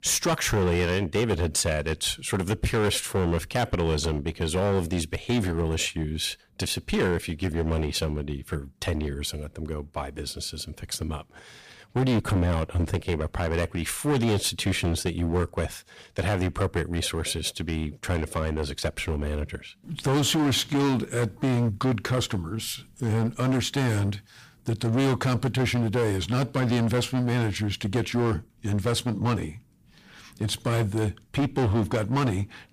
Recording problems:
distortion; heavy; 13% of the sound clipped

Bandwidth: 15 kHz